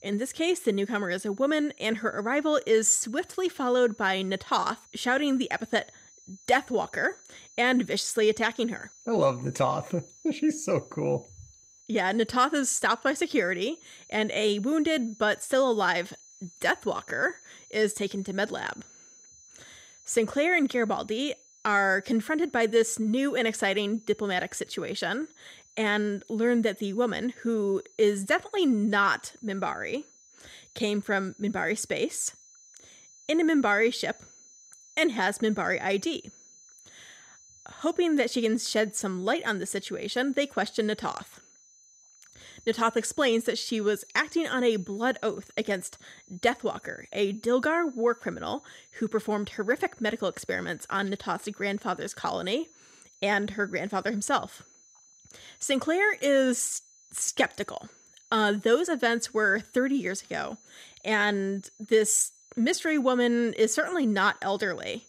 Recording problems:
high-pitched whine; faint; throughout; 6 kHz, 25 dB below the speech

